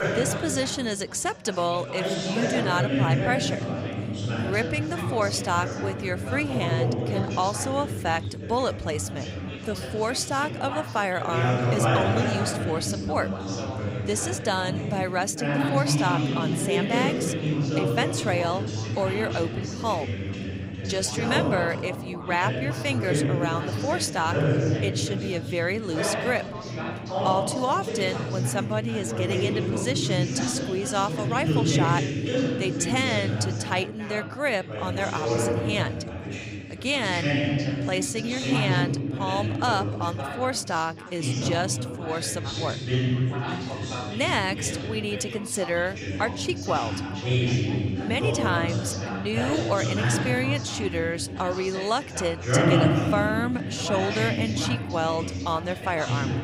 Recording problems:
chatter from many people; very loud; throughout; as loud as the speech

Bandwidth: 15.5 kHz